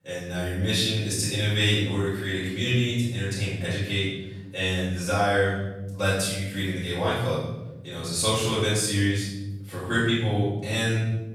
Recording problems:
room echo; strong; dies away in 1.1 s
off-mic speech; far

